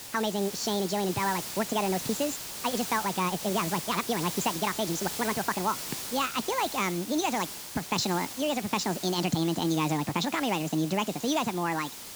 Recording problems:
wrong speed and pitch; too fast and too high; 1.7 times normal speed
high frequencies cut off; noticeable; nothing above 7.5 kHz
hiss; loud; throughout; 7 dB below the speech

